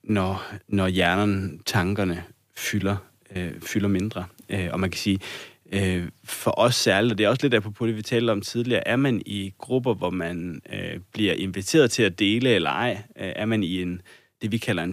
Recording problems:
abrupt cut into speech; at the end

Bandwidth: 15 kHz